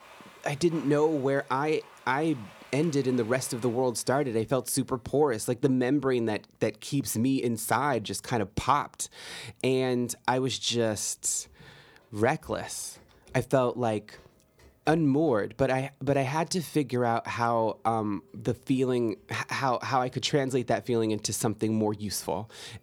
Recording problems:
household noises; faint; throughout; 25 dB below the speech

